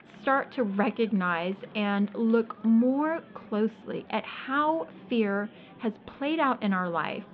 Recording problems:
muffled; very; fading above 3.5 kHz
murmuring crowd; faint; throughout; 20 dB below the speech

